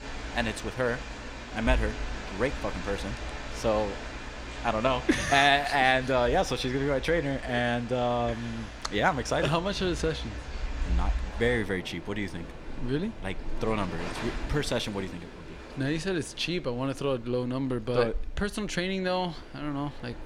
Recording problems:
rain or running water; loud; throughout; 10 dB below the speech

